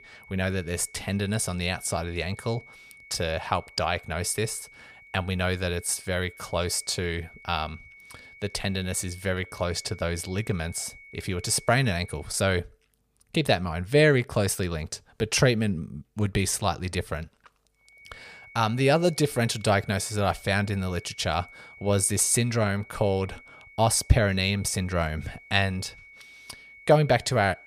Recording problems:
high-pitched whine; faint; until 12 s and from 18 s on; 2 kHz, 20 dB below the speech

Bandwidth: 15 kHz